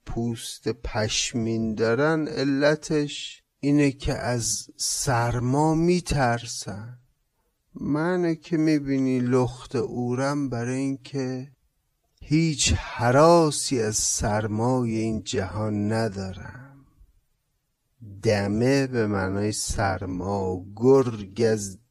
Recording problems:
wrong speed, natural pitch; too slow; 0.6 times normal speed

